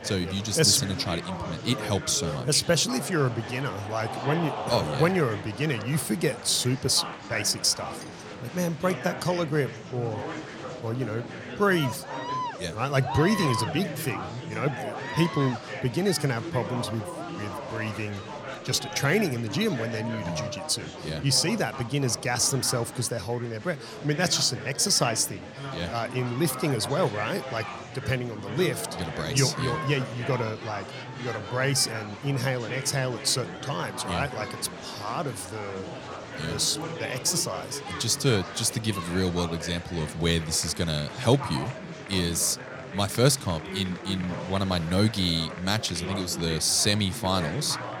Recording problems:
murmuring crowd; loud; throughout; 9 dB below the speech

